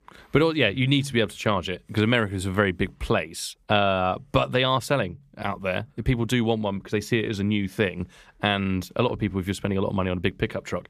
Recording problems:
none

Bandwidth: 14.5 kHz